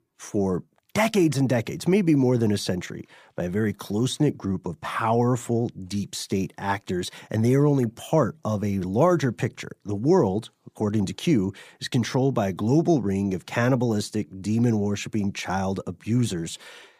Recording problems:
none

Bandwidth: 15 kHz